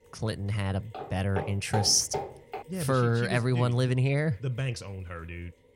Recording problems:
machinery noise; faint; throughout; 30 dB below the speech
footsteps; noticeable; from 1 to 2.5 s; peak 7 dB below the speech

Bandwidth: 16 kHz